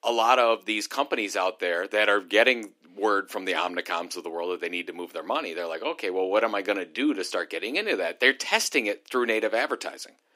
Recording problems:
thin; somewhat; fading below 300 Hz

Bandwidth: 15.5 kHz